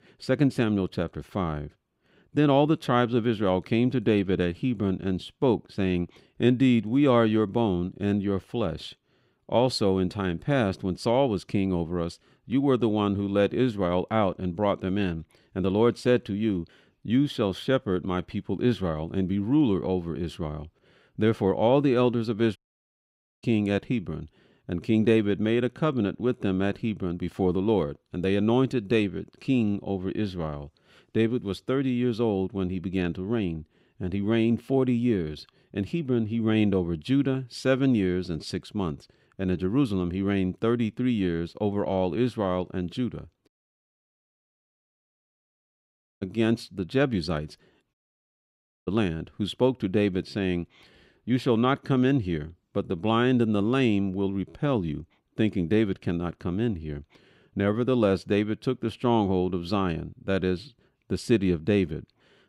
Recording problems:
audio cutting out; at 23 s for 1 s, at 43 s for 2.5 s and at 48 s for 1 s

